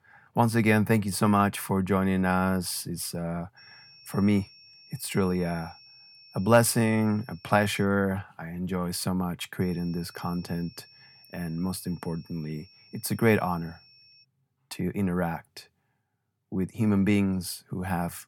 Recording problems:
high-pitched whine; faint; from 3.5 to 8 s and from 9.5 to 14 s; 5.5 kHz, 25 dB below the speech

